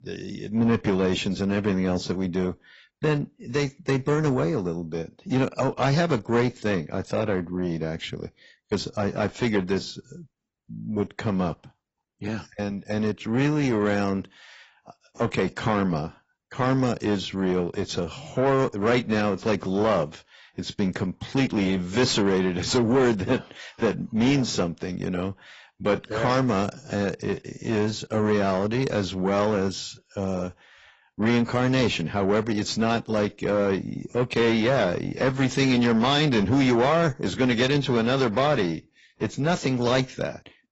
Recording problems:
garbled, watery; badly; nothing above 7.5 kHz
distortion; slight; 10 dB below the speech

